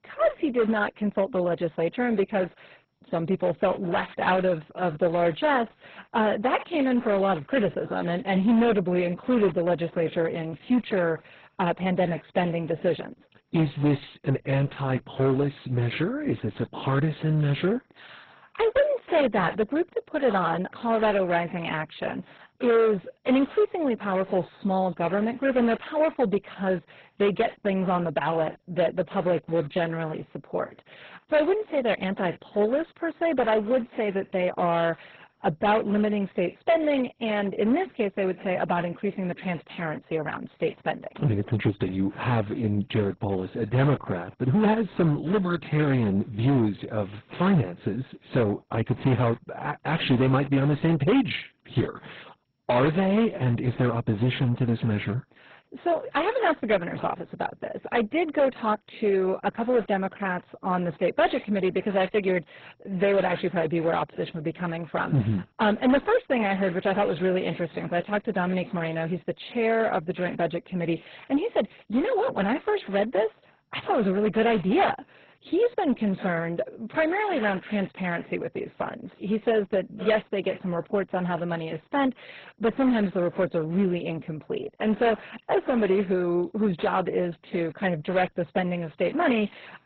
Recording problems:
garbled, watery; badly; nothing above 4 kHz
distortion; slight; 5% of the sound clipped

